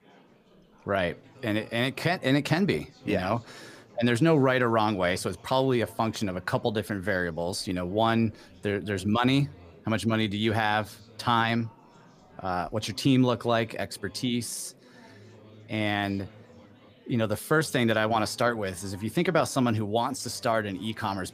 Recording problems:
chatter from many people; faint; throughout; 25 dB below the speech

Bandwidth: 15 kHz